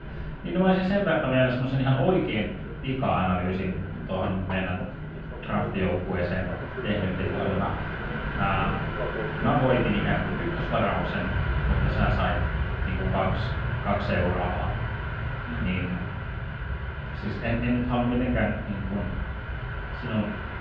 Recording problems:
off-mic speech; far
muffled; very; fading above 3 kHz
room echo; noticeable; dies away in 0.6 s
train or aircraft noise; loud; throughout; 5 dB below the speech
murmuring crowd; faint; throughout; 25 dB below the speech

